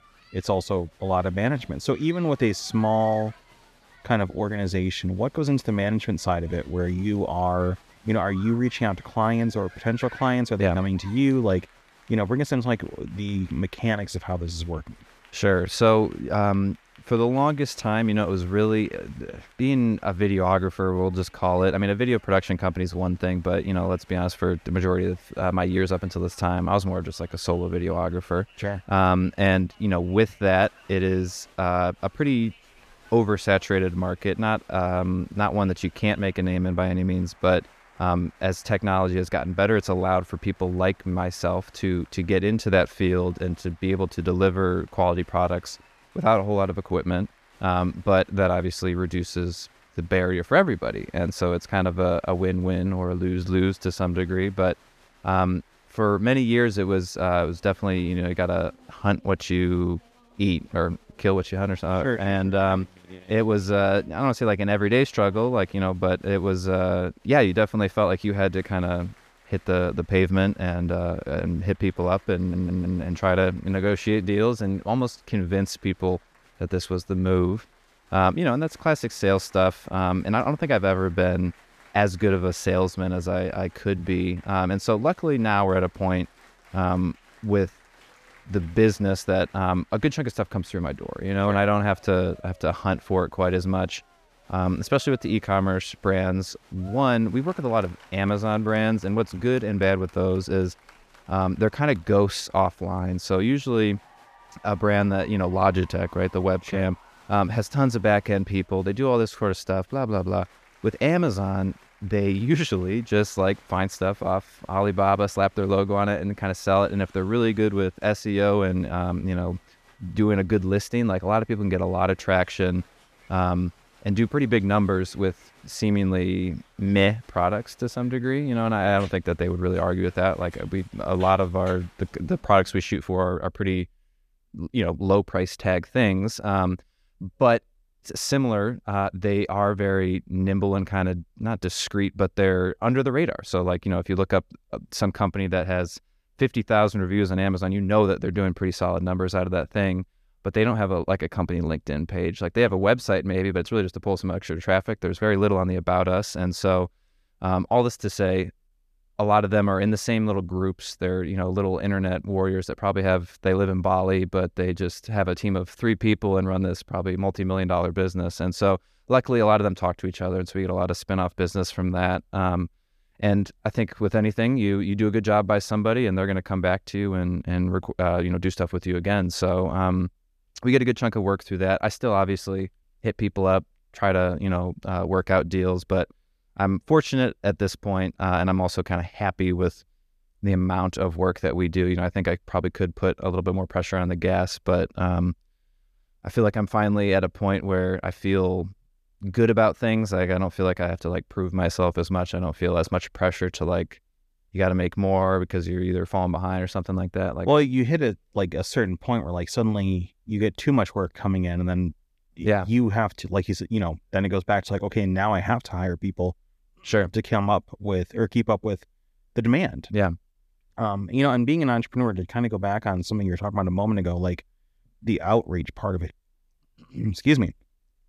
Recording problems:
crowd noise; faint; until 2:13; 30 dB below the speech
audio stuttering; at 1:12

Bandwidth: 14.5 kHz